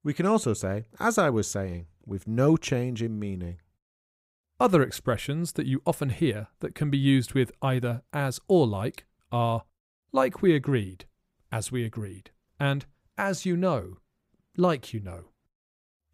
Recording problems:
none

